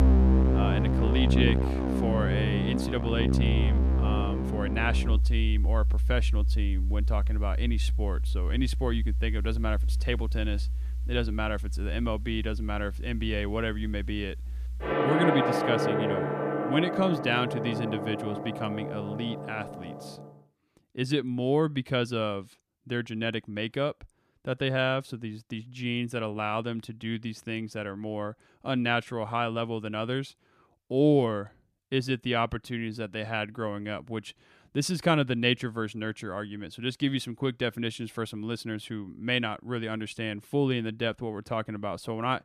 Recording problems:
background music; very loud; until 20 s; 2 dB above the speech

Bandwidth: 14.5 kHz